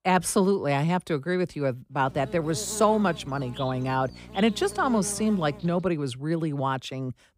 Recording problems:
electrical hum; noticeable; from 2 to 6 s; 60 Hz, 15 dB below the speech

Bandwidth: 15.5 kHz